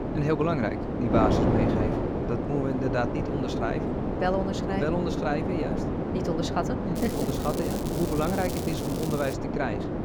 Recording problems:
wind noise on the microphone; heavy; 1 dB below the speech
crackling; noticeable; from 7 to 9.5 s; 10 dB below the speech

